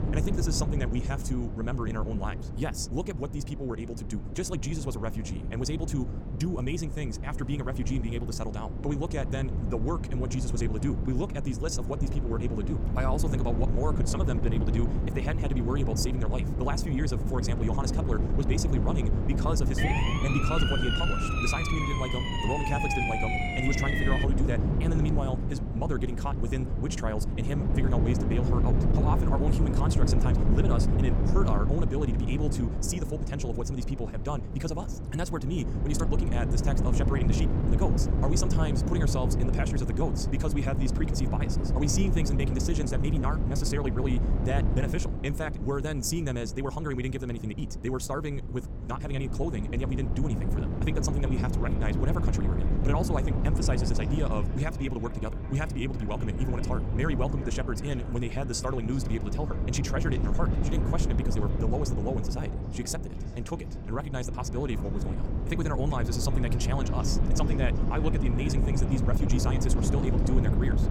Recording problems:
wrong speed, natural pitch; too fast; 1.8 times normal speed
echo of what is said; noticeable; from 51 s on; 390 ms later, 15 dB below the speech
wind noise on the microphone; heavy; 4 dB below the speech
siren; loud; from 20 to 24 s; peak 4 dB above the speech

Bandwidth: 18 kHz